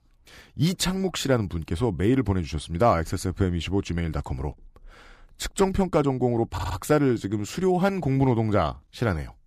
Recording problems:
audio stuttering; at 6.5 s

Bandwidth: 15 kHz